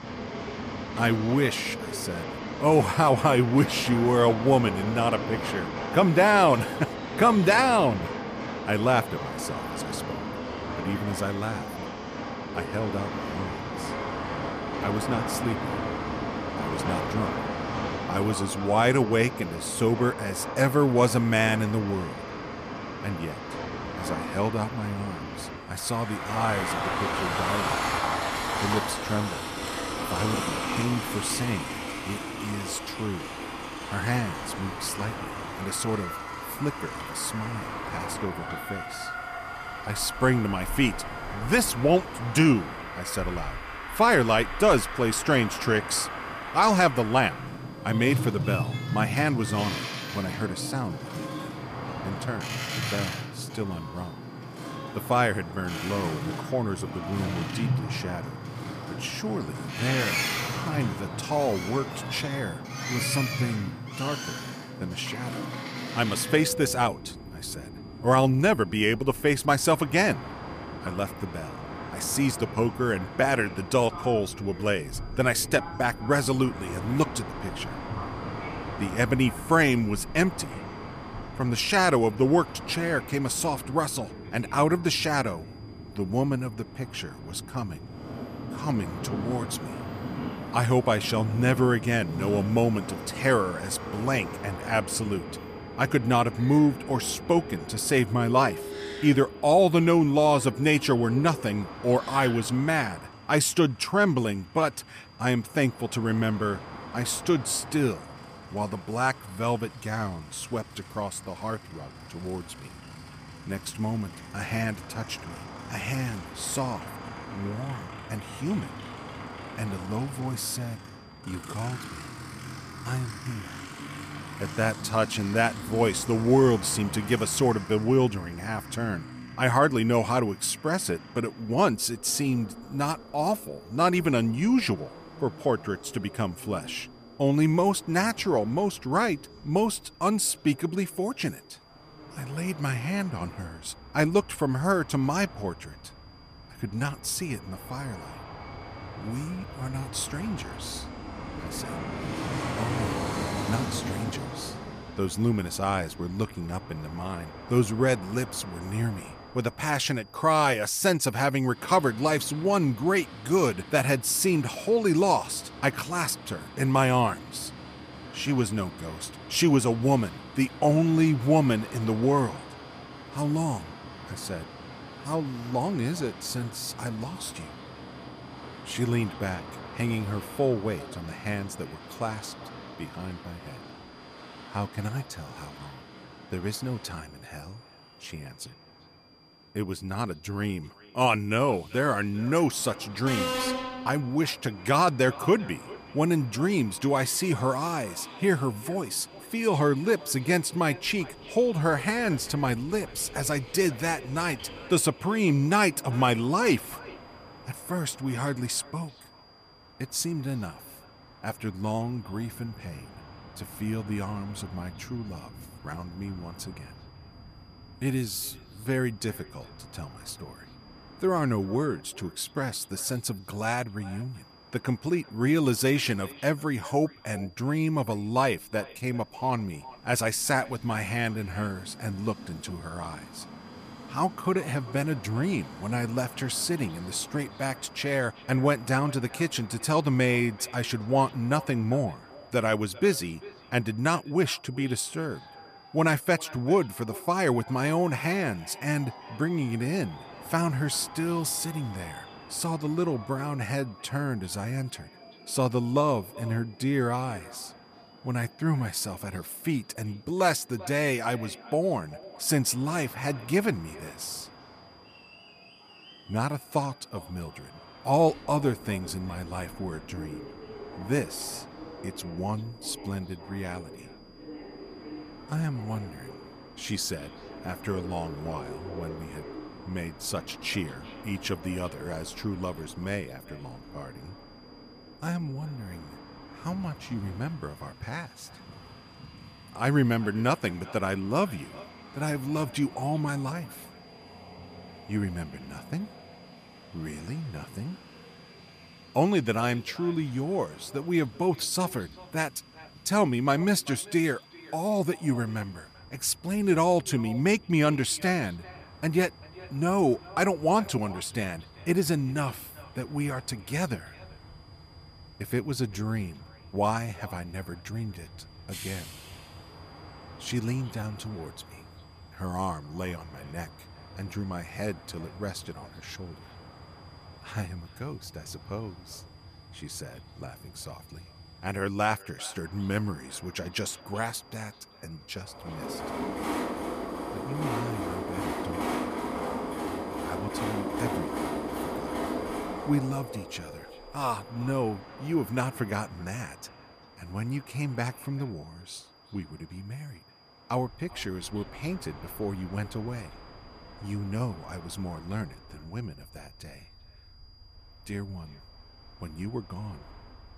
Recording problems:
echo of what is said; faint; from 2:55 on; 390 ms later, 25 dB below the speech
train or aircraft noise; loud; throughout; 9 dB below the speech
high-pitched whine; faint; throughout; 5 kHz, 30 dB below the speech

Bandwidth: 14.5 kHz